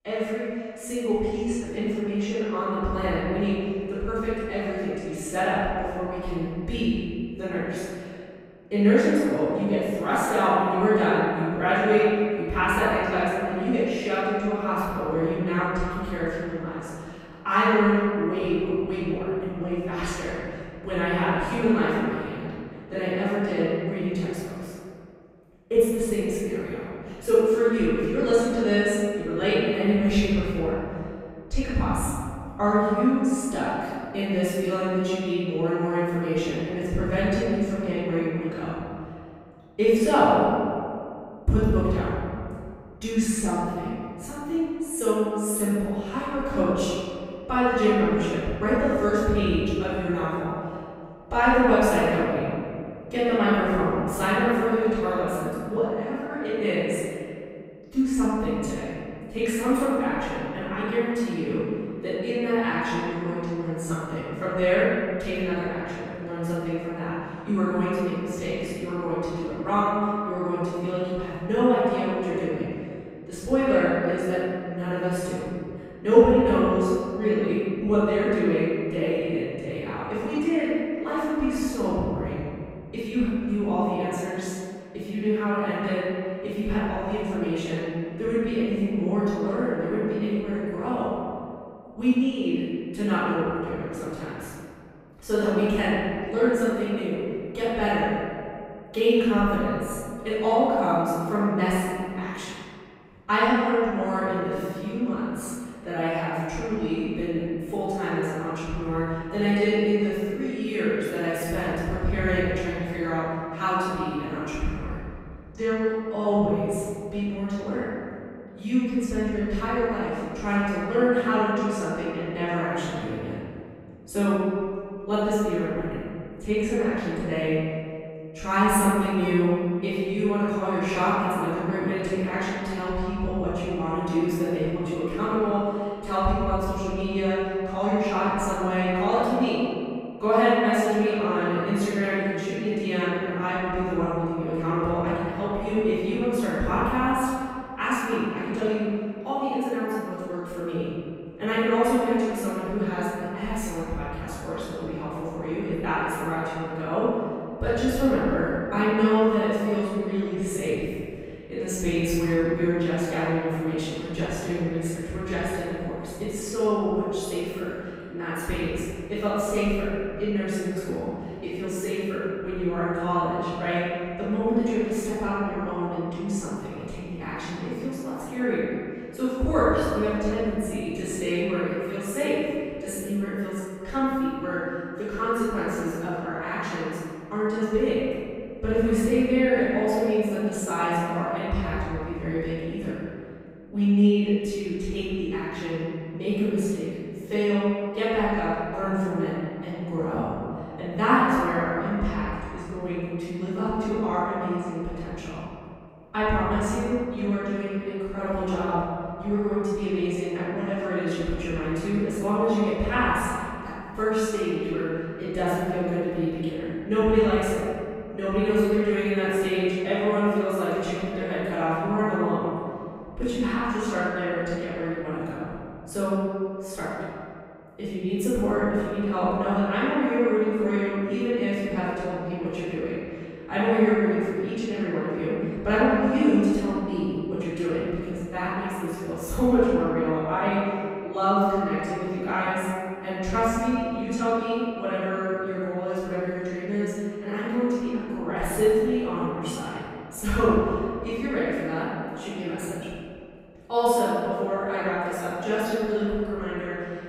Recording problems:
room echo; strong; dies away in 2.2 s
off-mic speech; far

